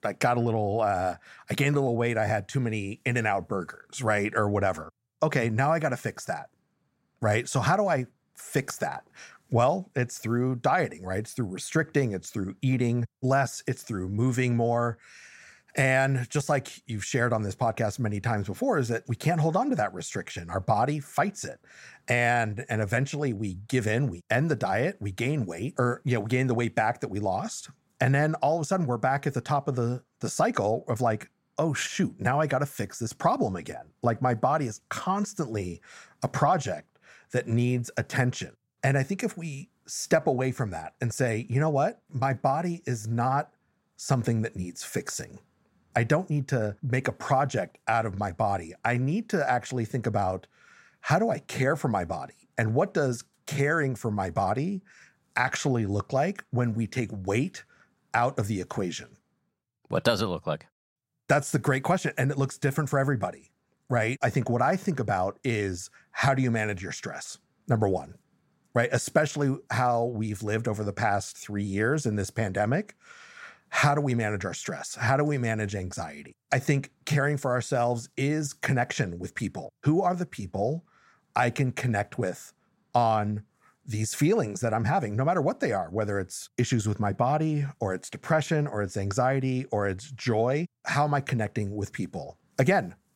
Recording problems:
none

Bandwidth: 16 kHz